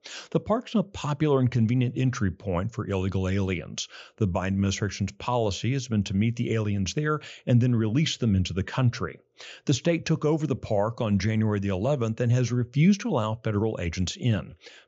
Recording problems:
high frequencies cut off; noticeable; nothing above 7.5 kHz

